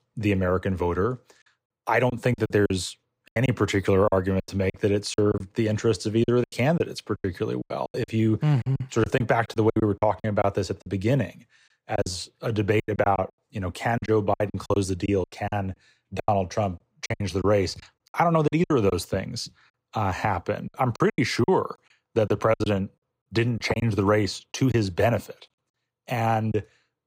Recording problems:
choppy; very; 12% of the speech affected

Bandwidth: 15.5 kHz